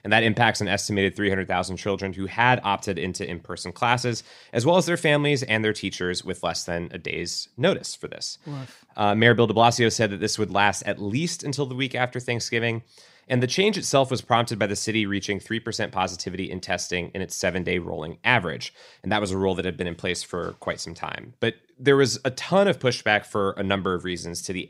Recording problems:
none

